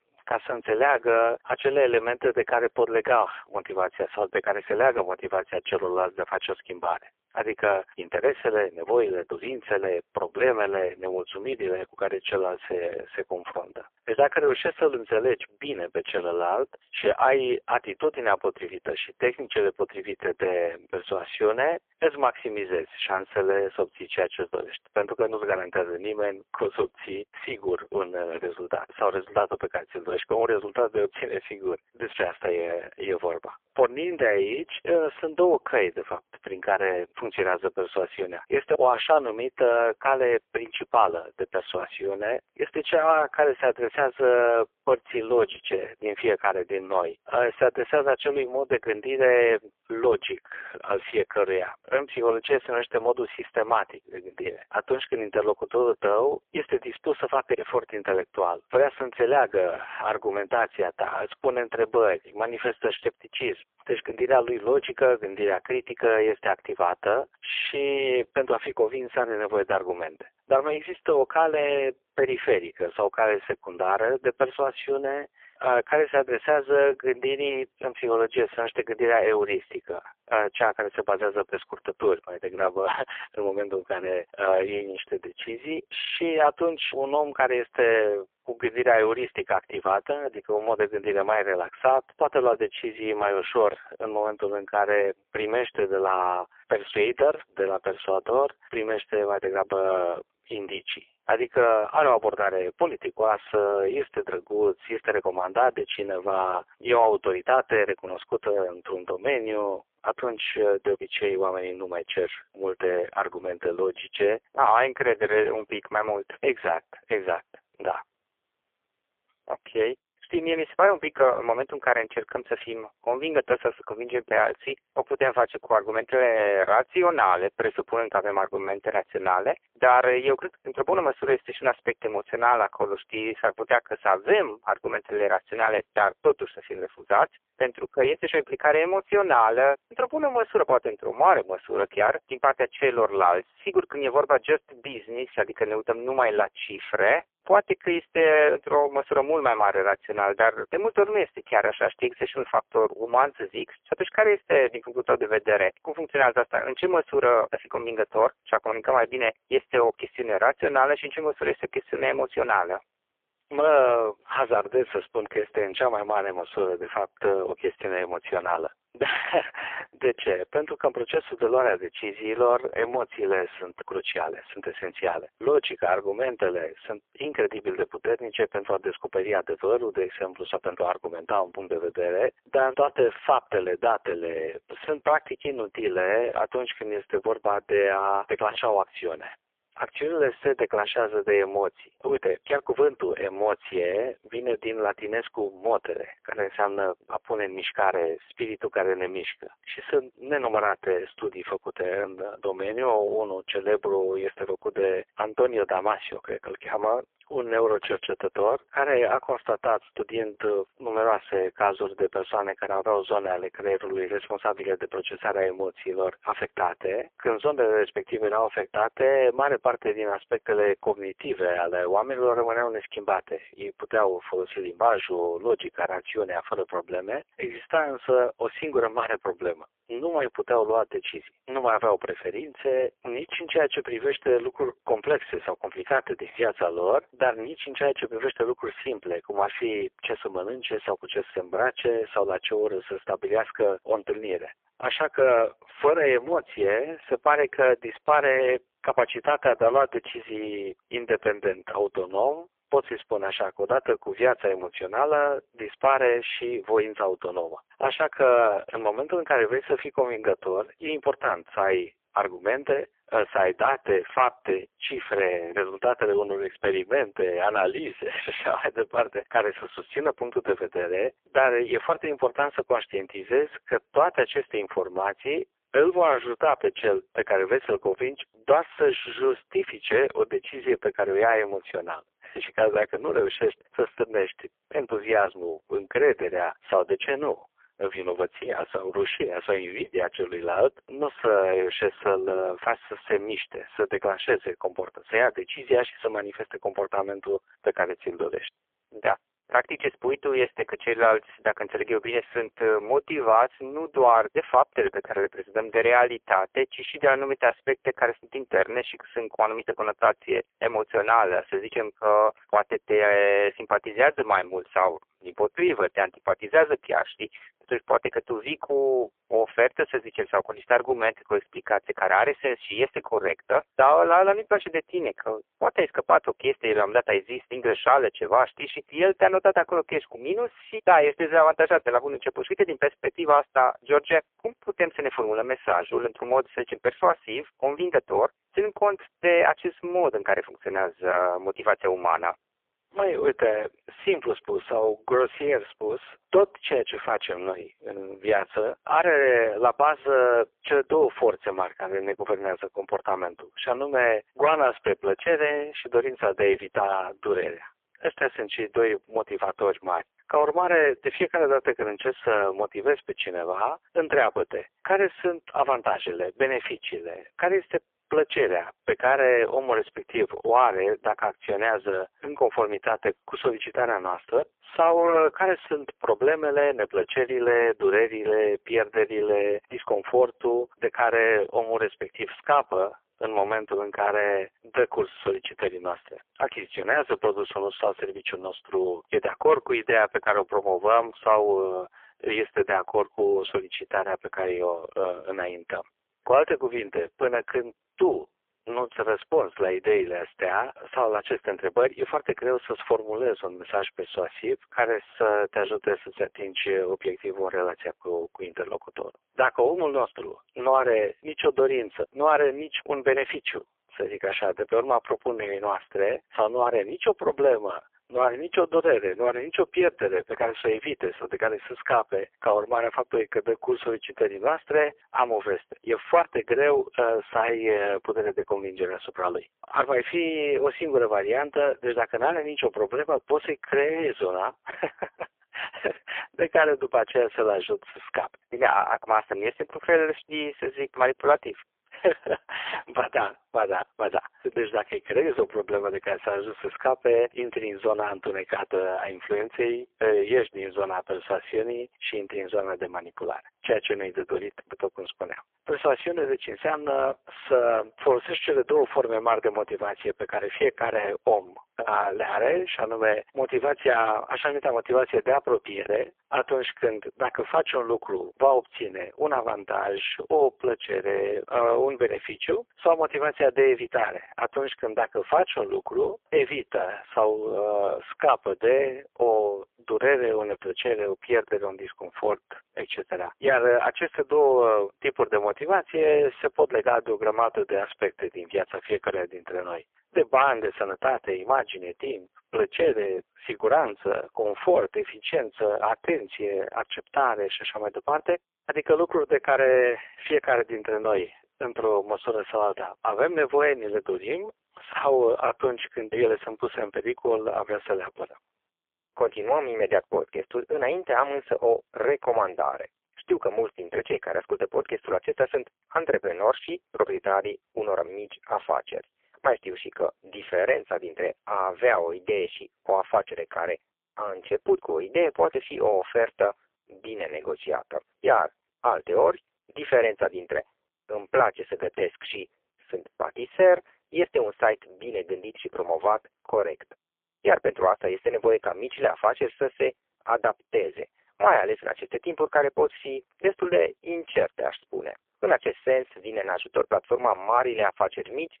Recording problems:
phone-call audio; poor line; nothing above 3.5 kHz

